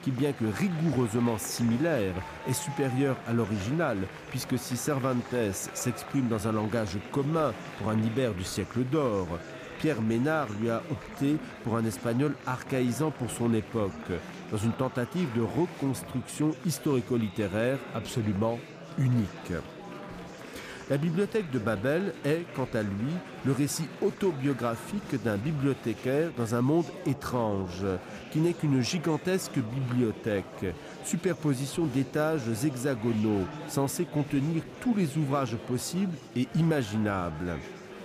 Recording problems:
murmuring crowd; noticeable; throughout; 15 dB below the speech

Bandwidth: 15 kHz